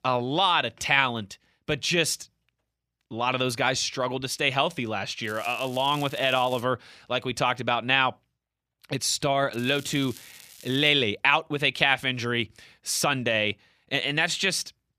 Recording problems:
crackling; faint; from 5 to 6.5 s and from 9.5 to 11 s; 20 dB below the speech

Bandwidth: 14.5 kHz